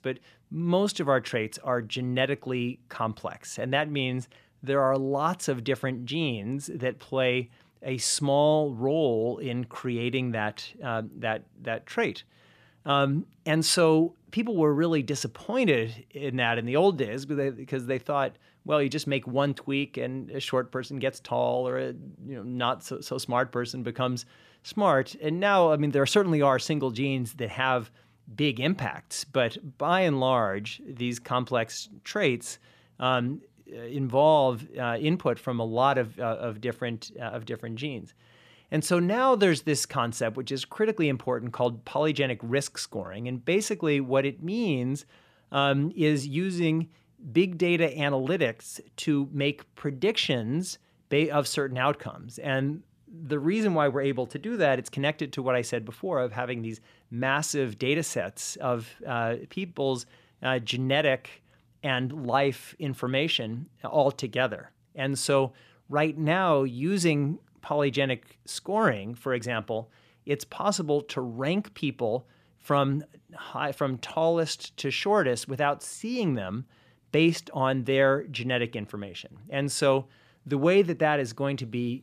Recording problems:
none

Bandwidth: 14.5 kHz